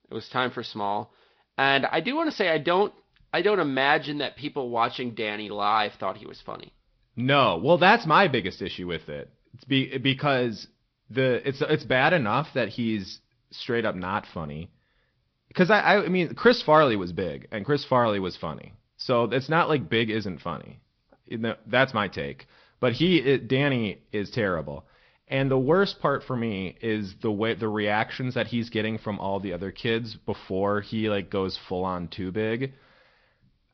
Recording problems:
high frequencies cut off; noticeable; nothing above 5.5 kHz
garbled, watery; slightly

